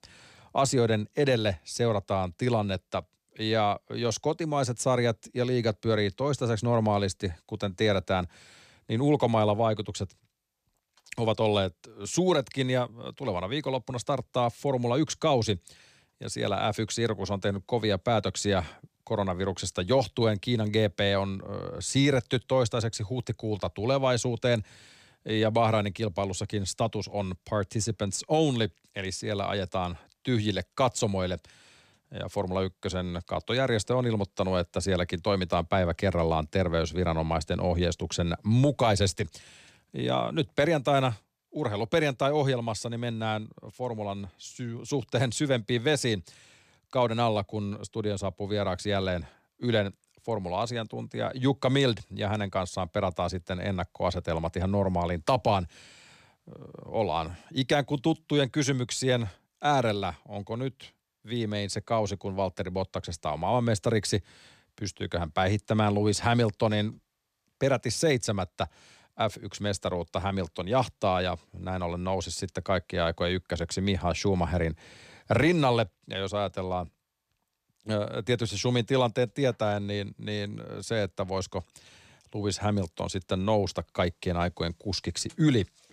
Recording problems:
none

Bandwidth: 14 kHz